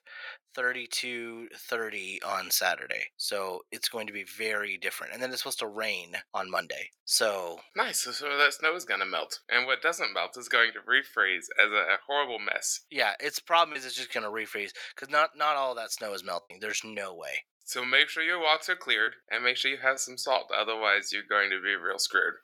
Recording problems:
thin; very; fading below 700 Hz
choppy; occasionally; 1% of the speech affected

